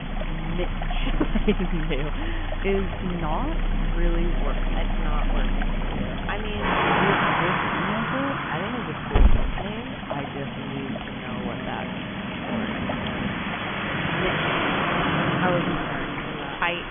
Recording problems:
high frequencies cut off; severe; nothing above 3.5 kHz
traffic noise; very loud; throughout; 4 dB above the speech
rain or running water; loud; throughout; 2 dB below the speech
hiss; loud; throughout; as loud as the speech
low rumble; noticeable; throughout; 10 dB below the speech

